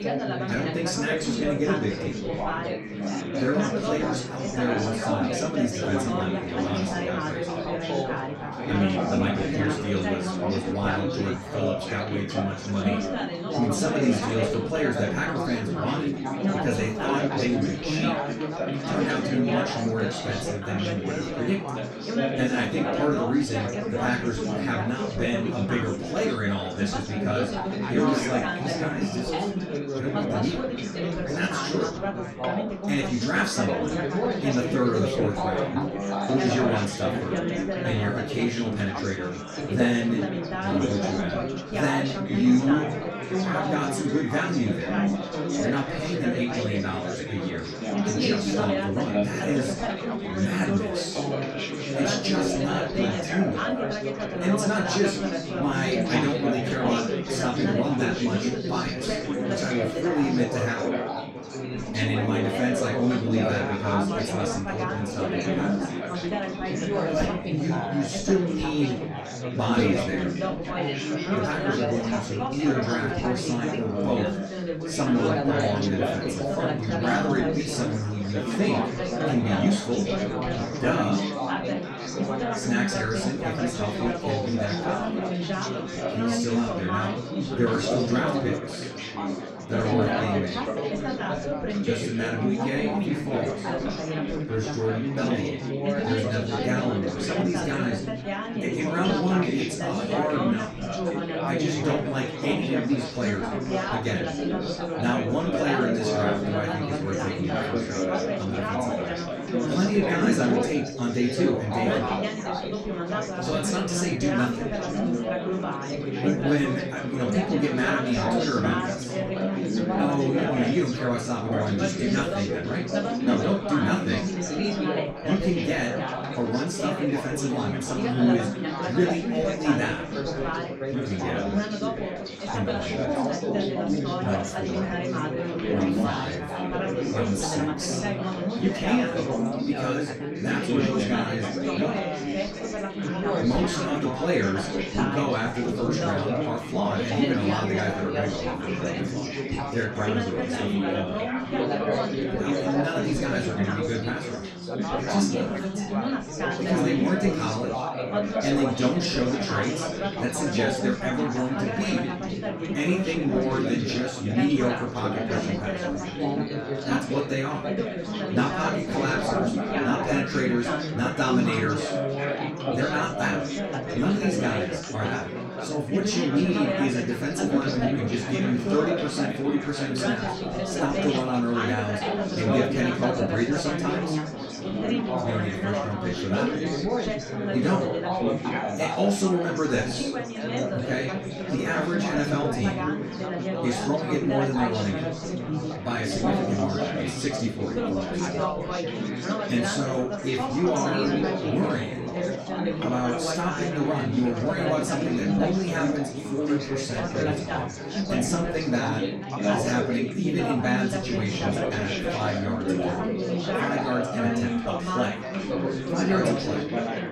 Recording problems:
off-mic speech; far
room echo; noticeable; dies away in 0.2 s
chatter from many people; very loud; throughout; as loud as the speech

